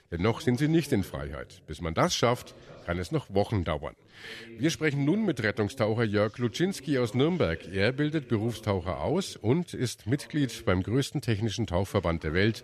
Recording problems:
voice in the background; faint; throughout; 20 dB below the speech

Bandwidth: 13.5 kHz